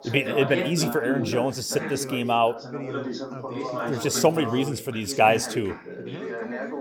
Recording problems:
background chatter; loud; throughout; 3 voices, 8 dB below the speech

